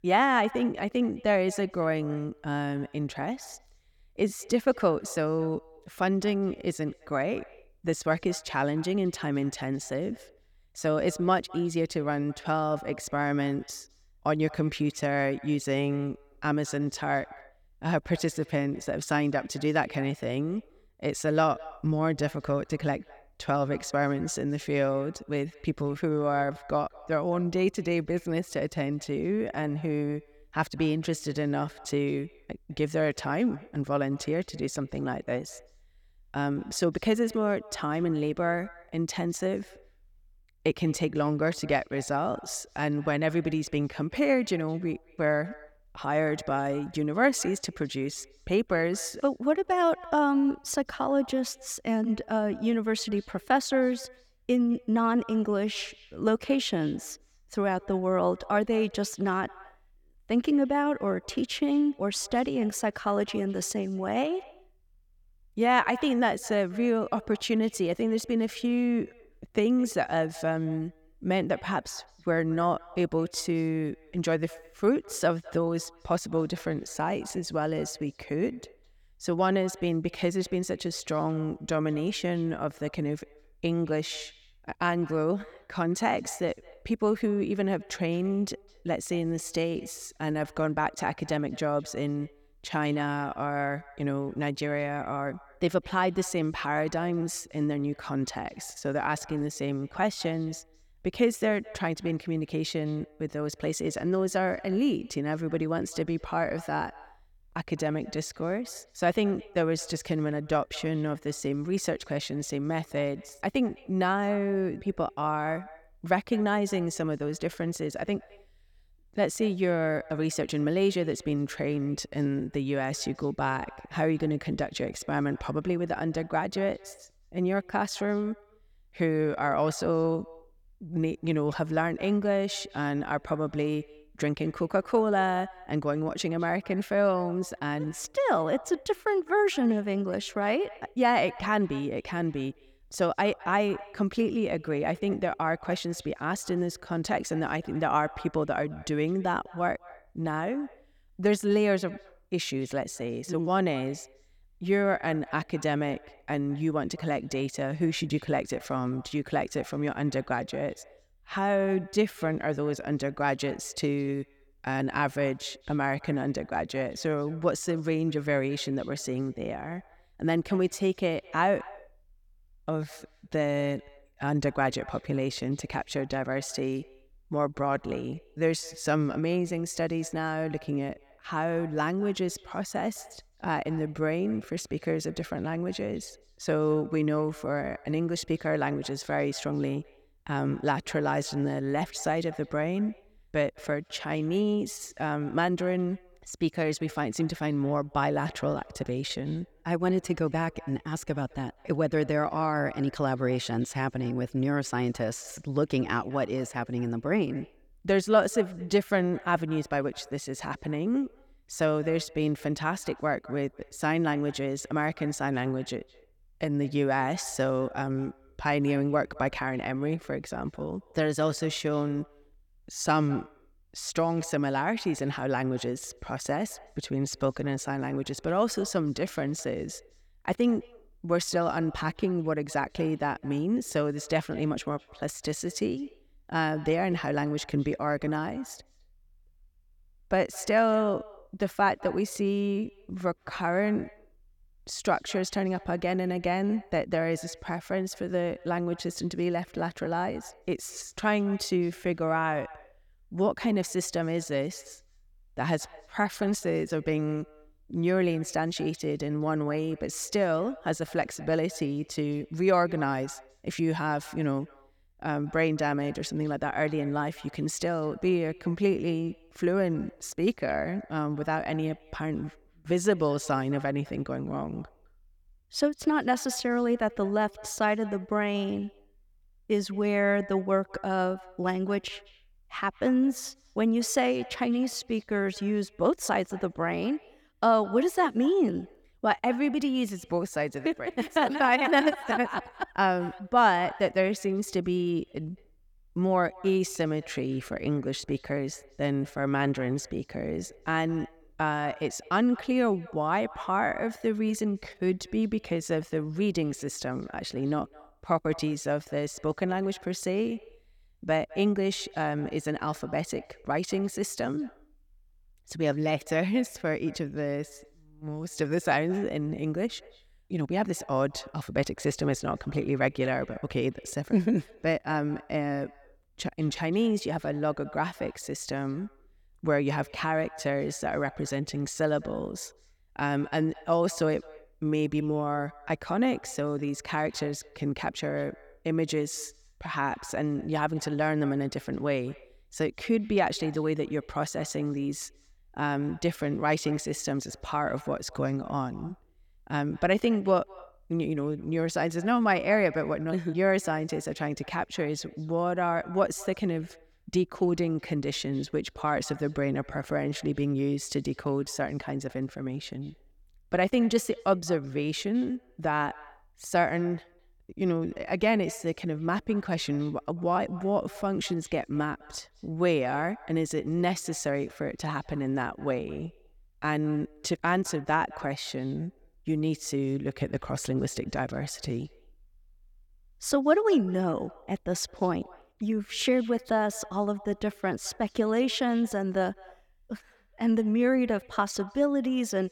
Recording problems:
echo of what is said; faint; throughout; 210 ms later, 20 dB below the speech

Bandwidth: 18.5 kHz